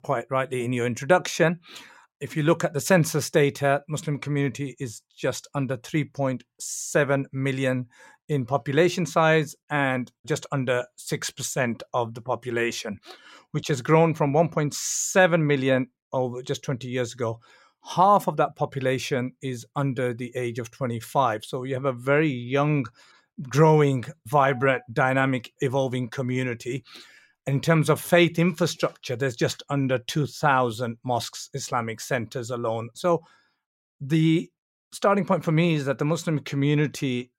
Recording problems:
none

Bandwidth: 16 kHz